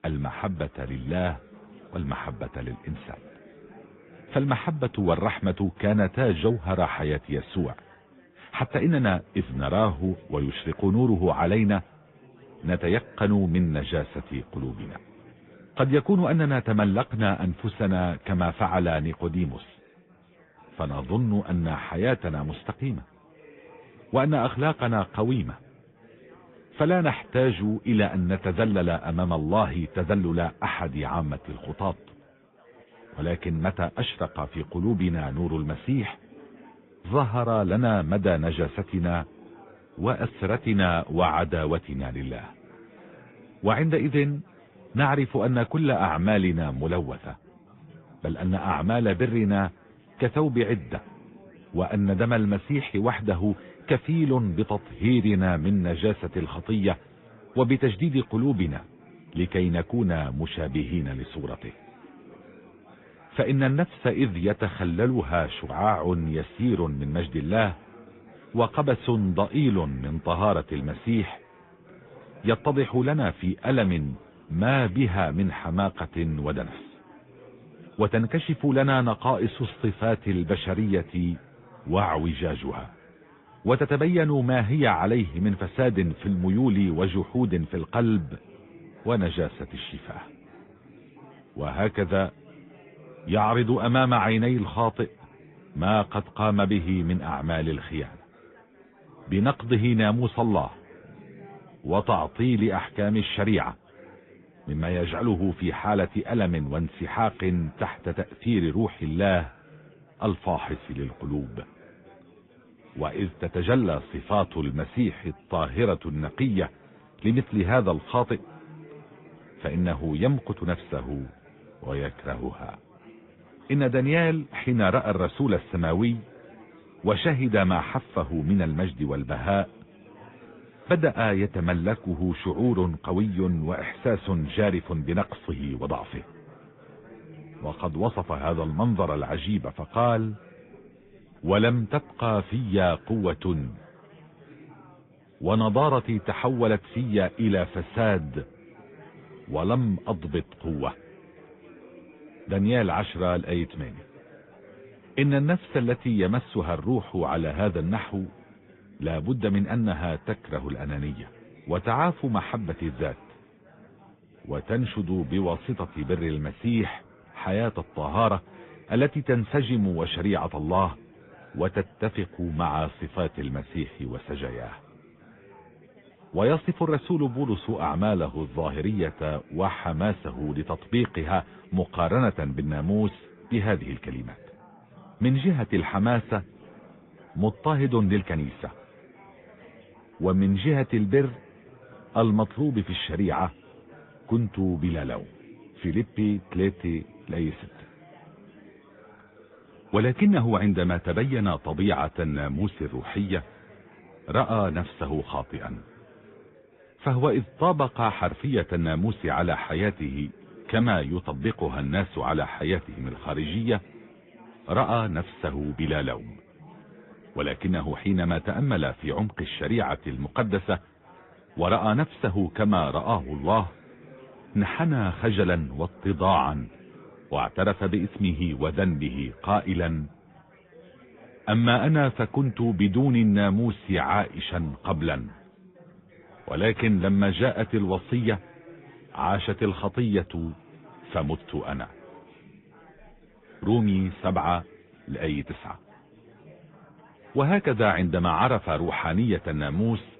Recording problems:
high frequencies cut off; severe; nothing above 3.5 kHz
garbled, watery; slightly
chatter from many people; faint; throughout; 25 dB below the speech

